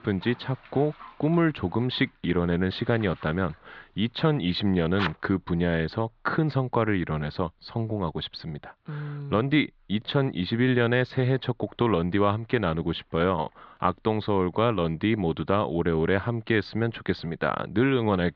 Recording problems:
muffled; slightly; fading above 4 kHz
high frequencies cut off; slight; nothing above 7.5 kHz
household noises; noticeable; until 5 s; 15 dB below the speech

